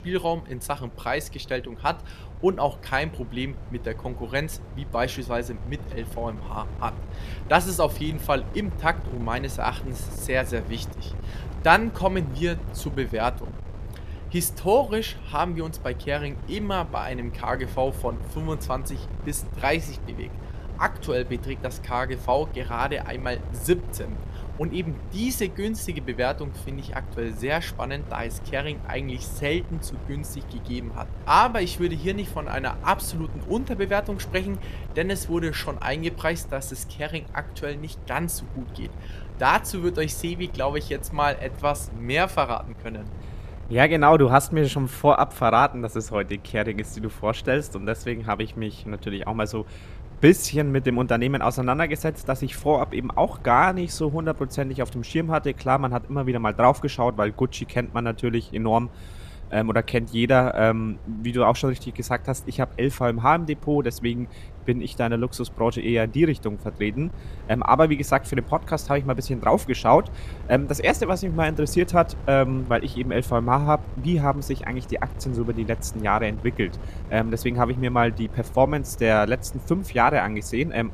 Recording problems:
wind noise on the microphone; occasional gusts; 25 dB below the speech

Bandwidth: 14.5 kHz